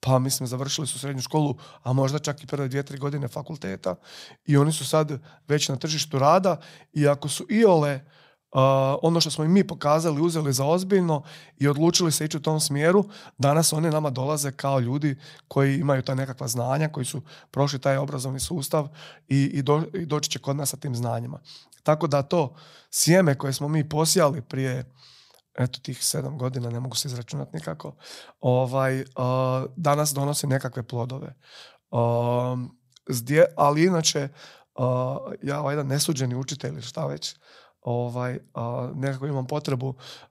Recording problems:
none

